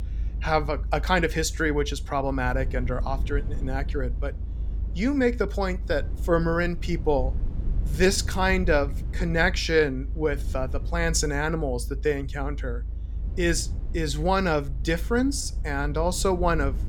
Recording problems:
low rumble; faint; throughout; 20 dB below the speech

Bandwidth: 17.5 kHz